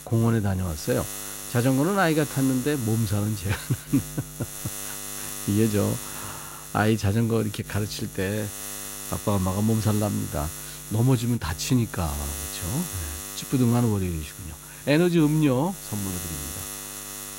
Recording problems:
electrical hum; loud; throughout; 60 Hz, 9 dB below the speech

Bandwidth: 16 kHz